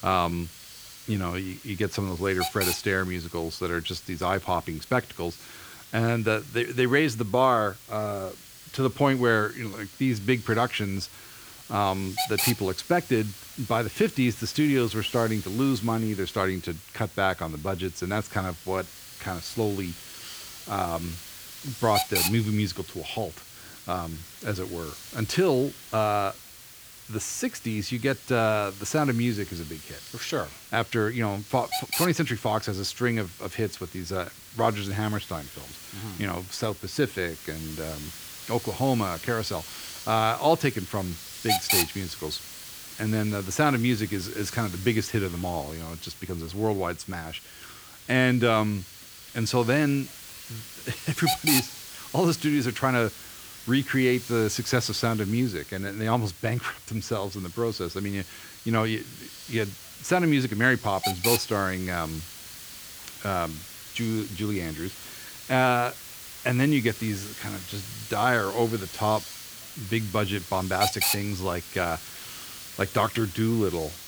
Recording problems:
hiss; loud; throughout; 8 dB below the speech

